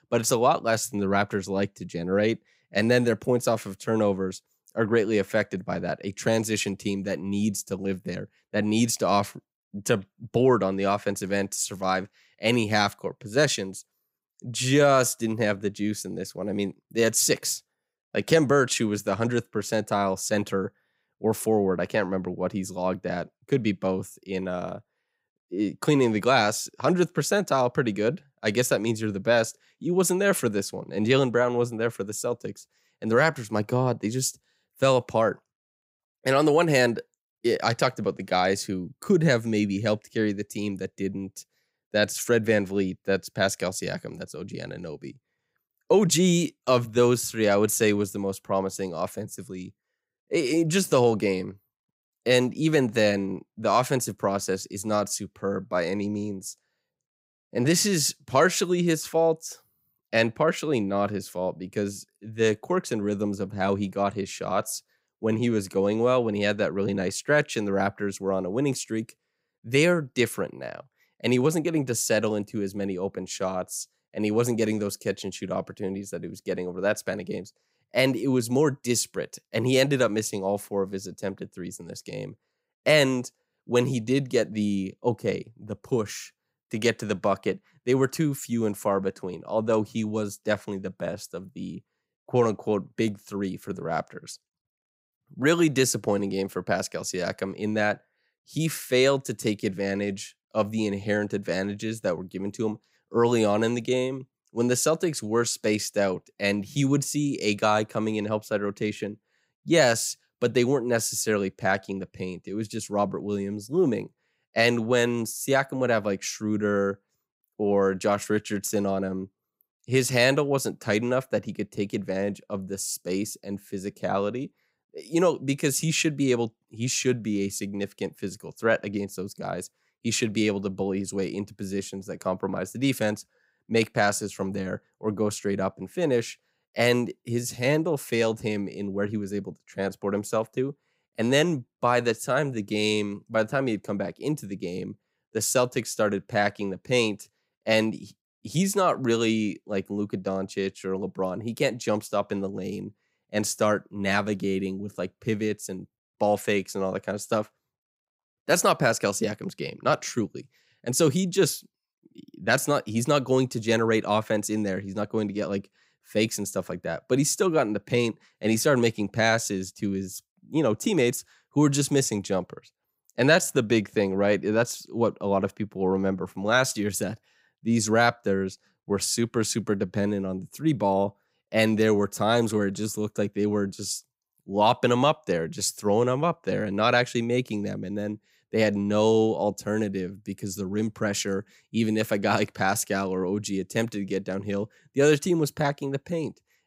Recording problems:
none

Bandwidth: 15.5 kHz